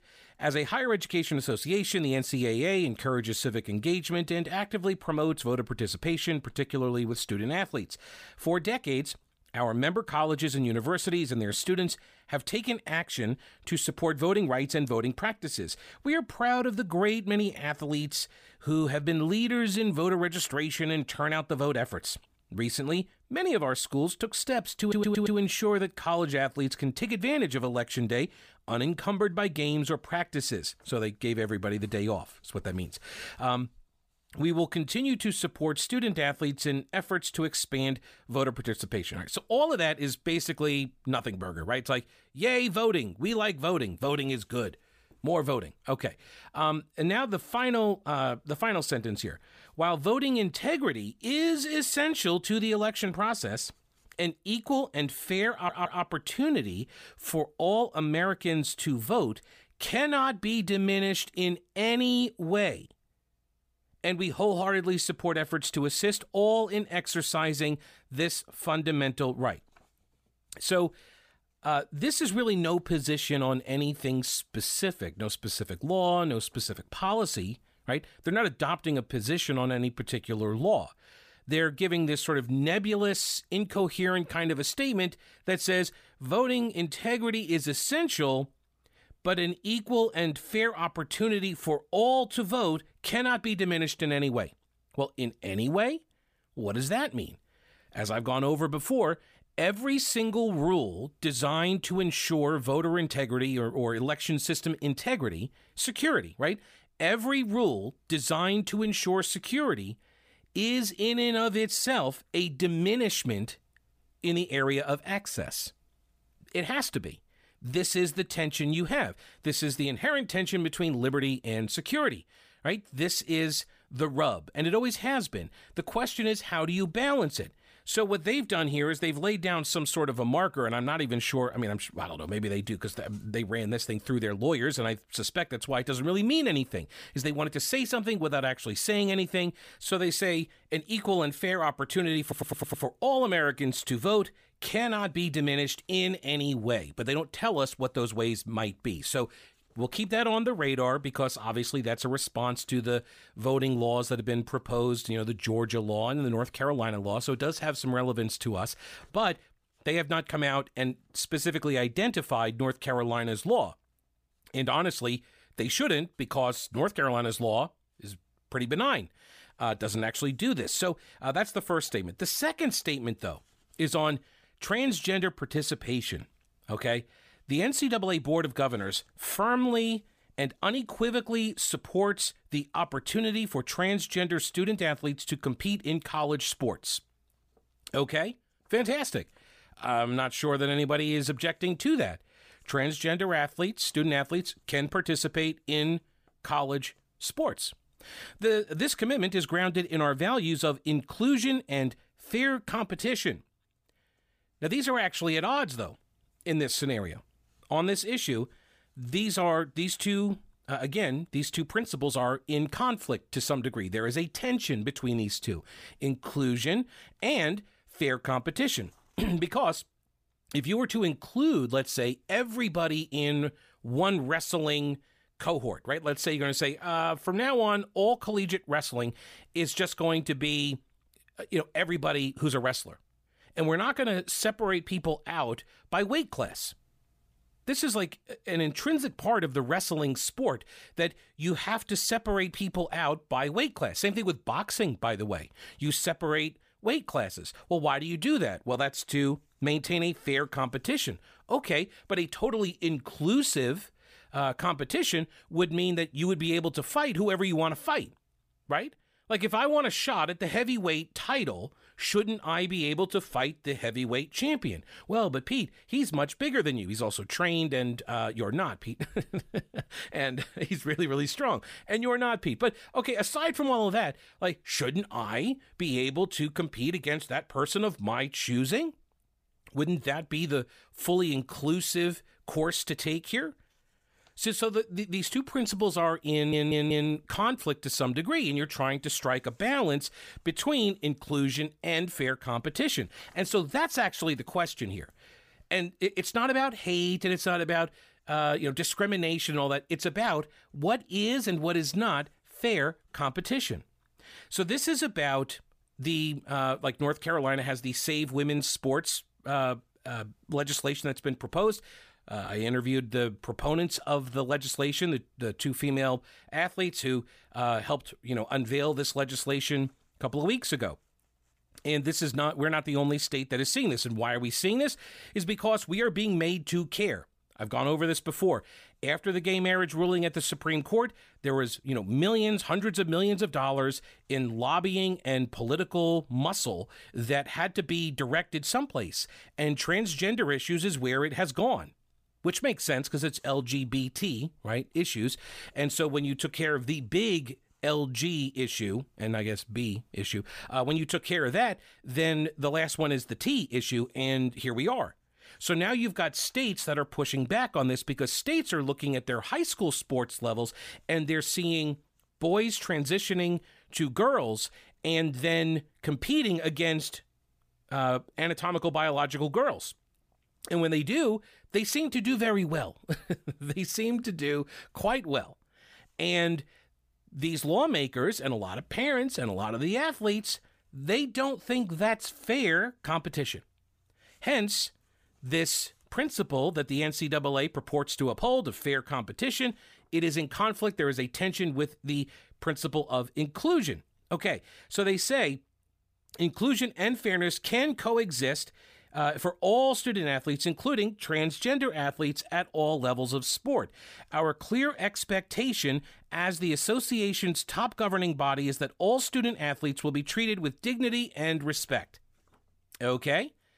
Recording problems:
audio stuttering; 4 times, first at 25 s

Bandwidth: 15 kHz